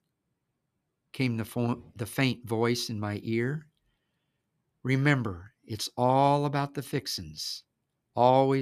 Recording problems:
abrupt cut into speech; at the end

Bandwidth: 14.5 kHz